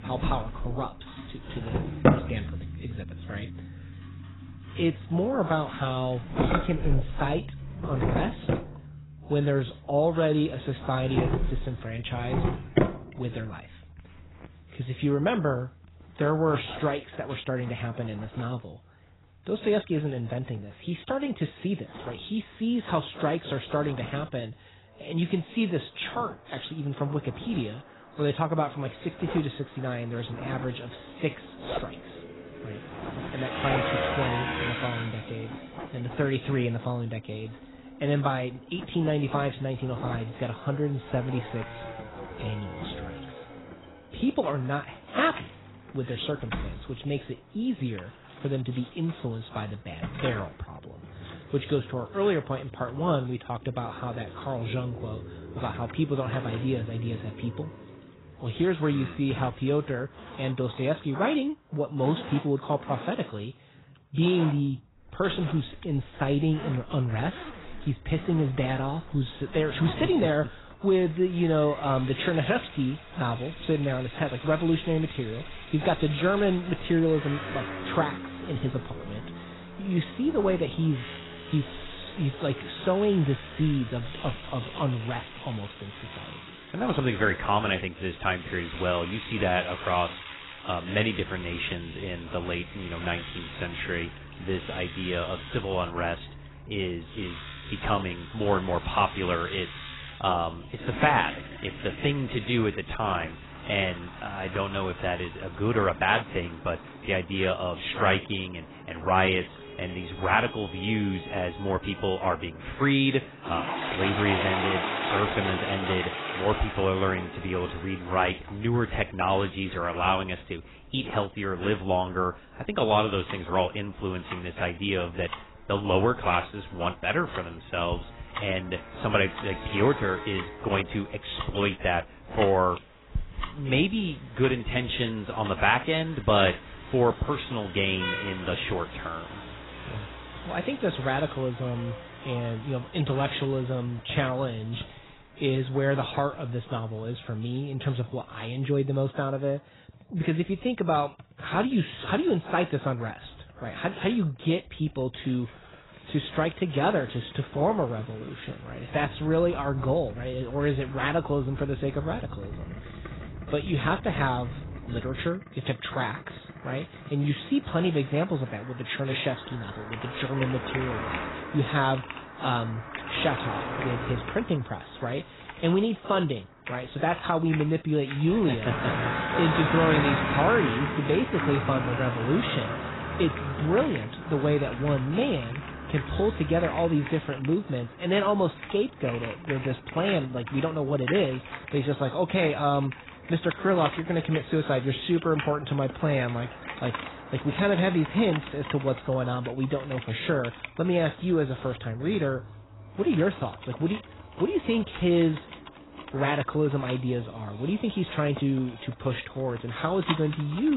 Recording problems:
garbled, watery; badly; nothing above 4 kHz
household noises; noticeable; throughout; 10 dB below the speech
traffic noise; noticeable; throughout; 10 dB below the speech
abrupt cut into speech; at the end

